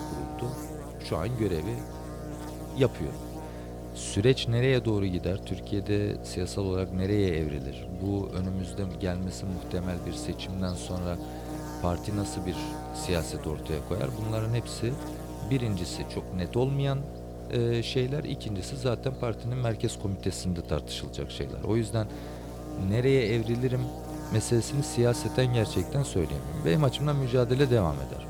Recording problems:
electrical hum; loud; throughout; 60 Hz, 9 dB below the speech

